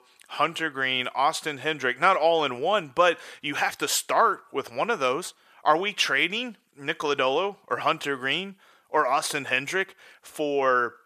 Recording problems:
thin; very; fading below 450 Hz

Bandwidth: 14.5 kHz